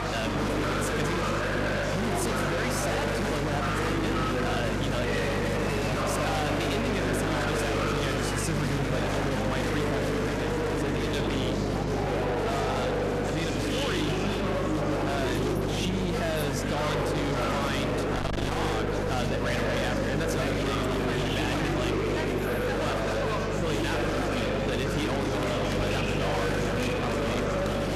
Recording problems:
distortion; heavy; 50% of the sound clipped
murmuring crowd; very loud; throughout; 3 dB above the speech
electrical hum; noticeable; throughout; 50 Hz, 10 dB below the speech

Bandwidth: 13.5 kHz